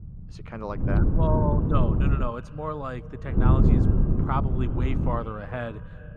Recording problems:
muffled; slightly; fading above 2 kHz
echo of what is said; faint; throughout; 170 ms later, 20 dB below the speech
wind noise on the microphone; heavy; from 1 to 2 s and from 3.5 to 5 s; 2 dB below the speech
low rumble; faint; throughout; 20 dB below the speech

